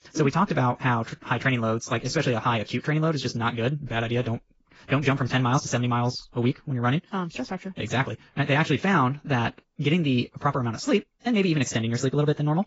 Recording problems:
garbled, watery; badly; nothing above 7.5 kHz
wrong speed, natural pitch; too fast; 1.6 times normal speed

